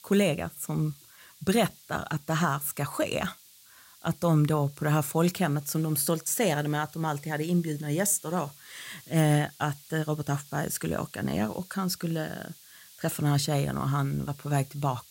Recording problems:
hiss; faint; throughout; 20 dB below the speech

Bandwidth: 16 kHz